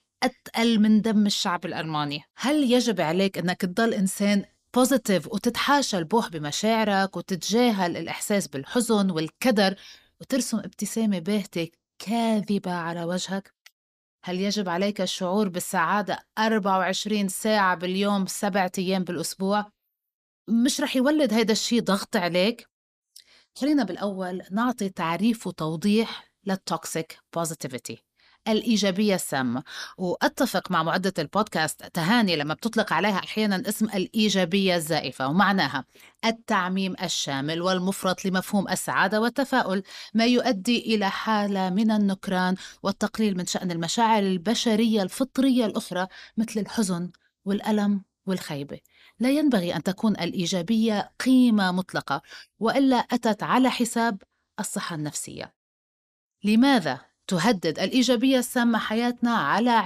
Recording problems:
abrupt cut into speech; at the end

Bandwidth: 14.5 kHz